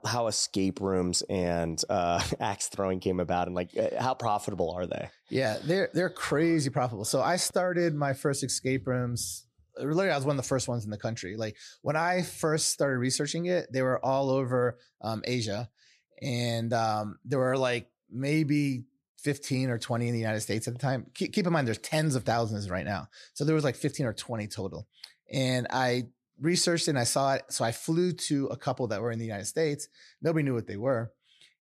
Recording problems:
none

